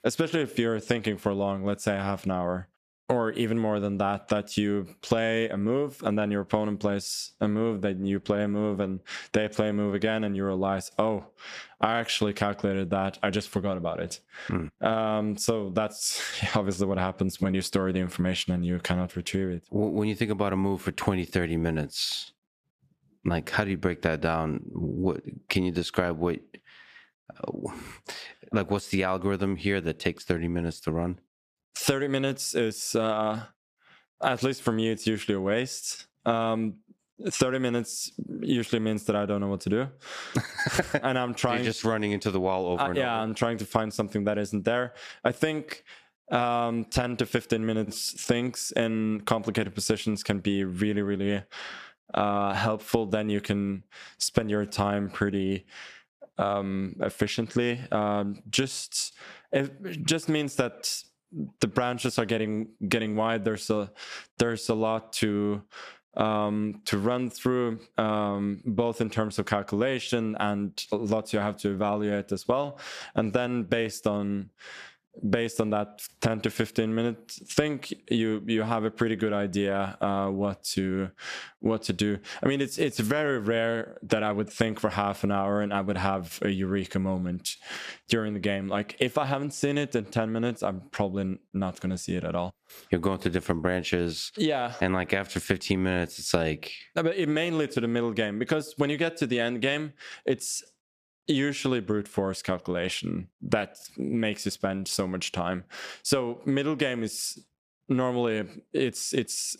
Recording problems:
squashed, flat; somewhat

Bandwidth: 14.5 kHz